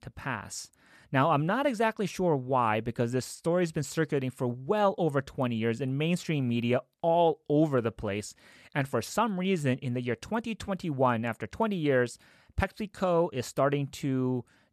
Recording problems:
none

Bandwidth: 13.5 kHz